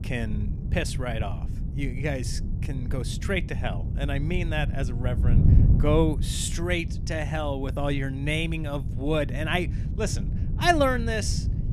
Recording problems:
wind noise on the microphone; occasional gusts; 10 dB below the speech

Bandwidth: 15 kHz